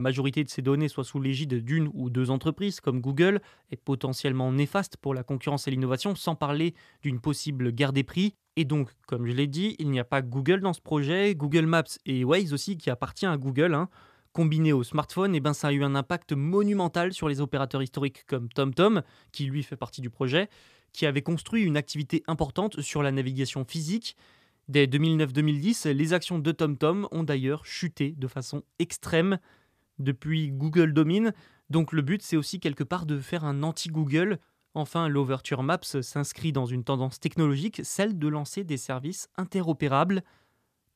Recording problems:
abrupt cut into speech; at the start

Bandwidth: 14.5 kHz